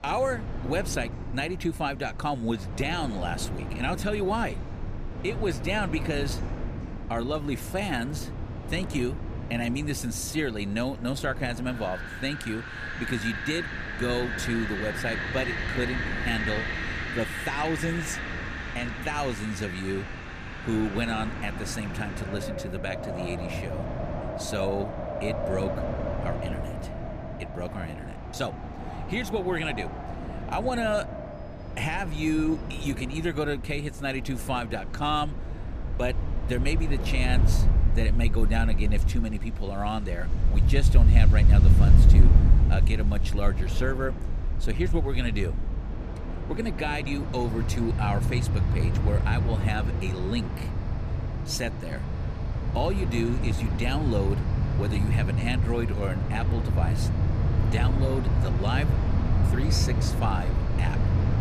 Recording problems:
wind in the background; very loud; throughout; 3 dB above the speech

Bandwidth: 14.5 kHz